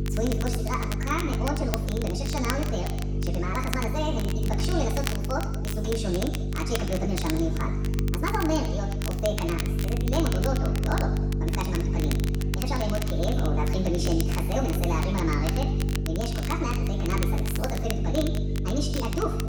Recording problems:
off-mic speech; far
wrong speed and pitch; too fast and too high; 1.5 times normal speed
room echo; noticeable; dies away in 1.2 s
electrical hum; loud; throughout; 50 Hz, 7 dB below the speech
crackle, like an old record; loud; 8 dB below the speech
background chatter; faint; throughout; 2 voices, 25 dB below the speech

